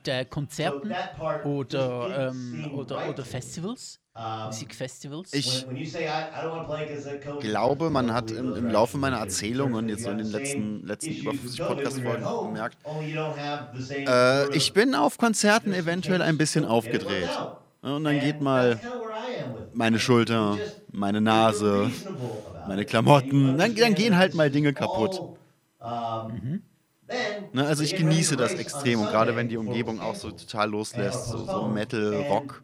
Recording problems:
voice in the background; loud; throughout; 8 dB below the speech

